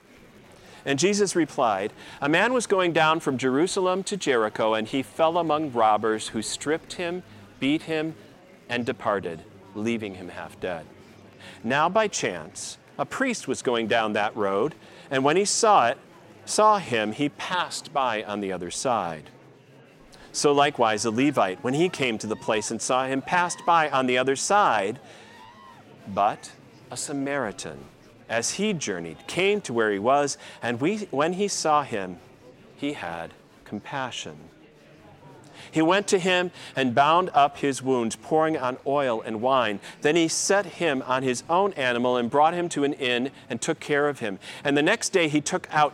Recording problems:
murmuring crowd; faint; throughout; 25 dB below the speech

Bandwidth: 16 kHz